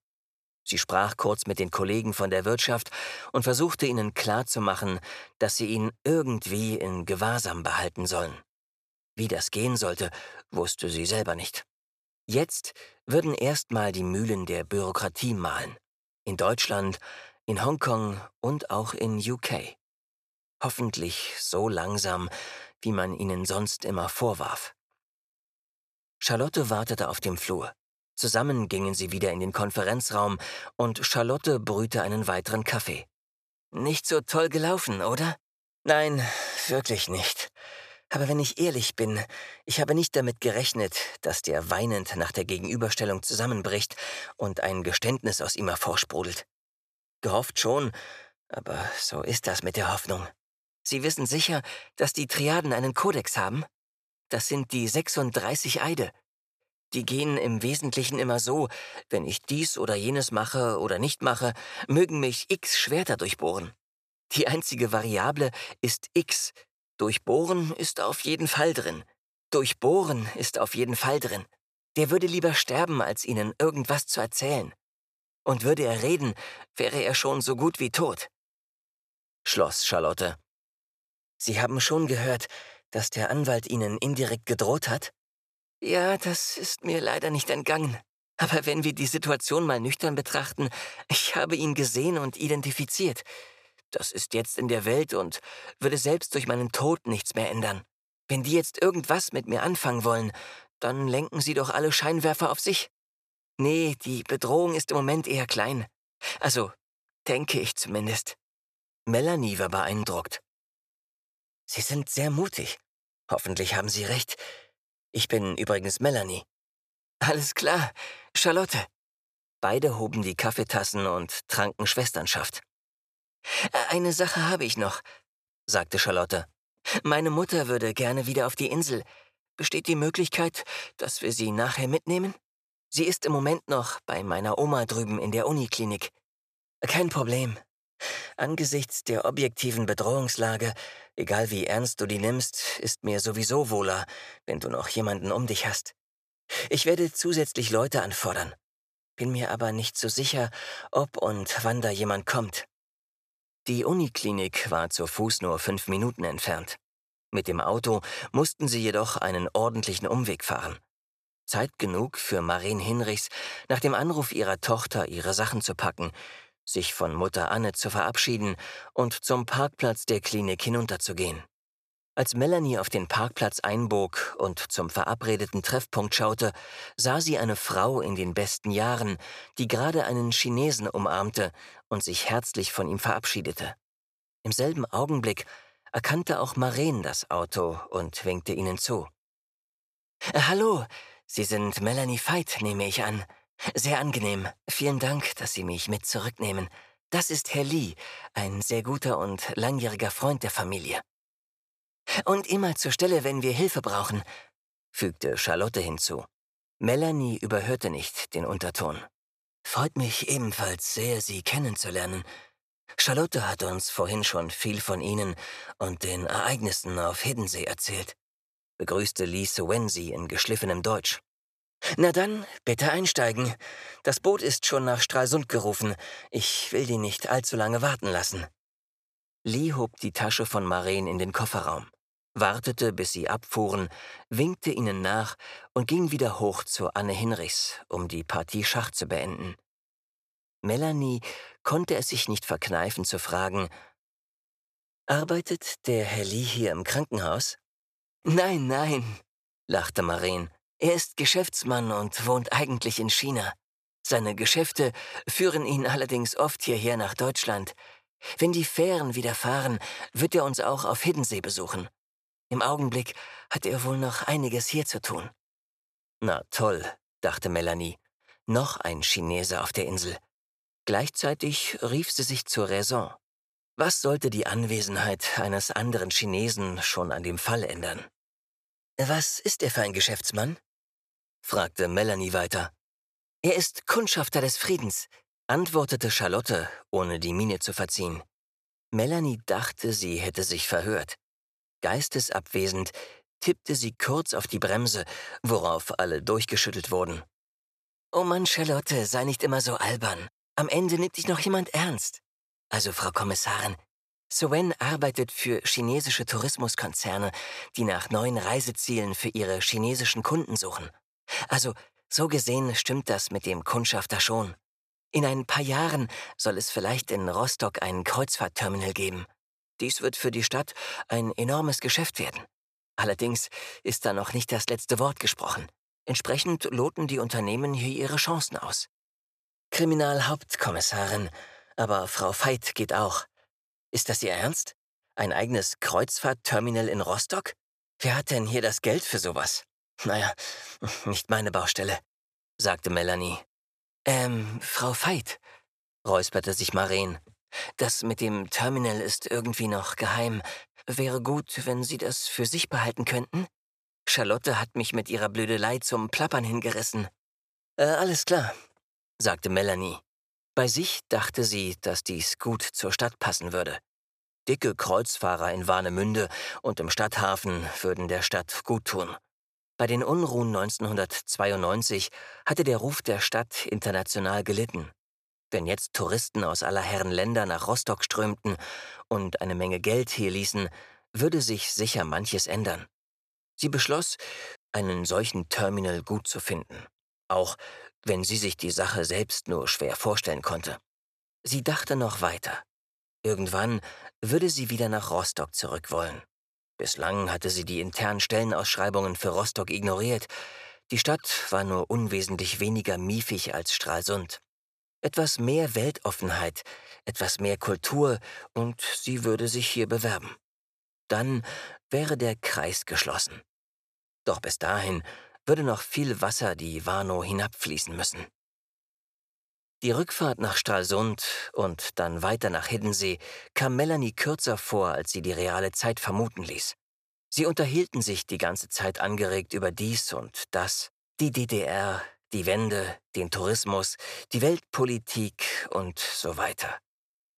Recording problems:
none

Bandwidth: 14.5 kHz